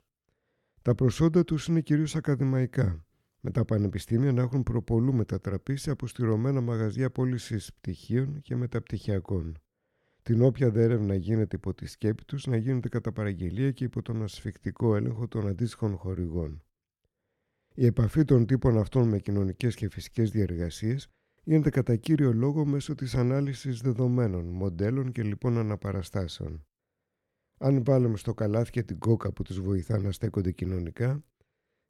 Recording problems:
none

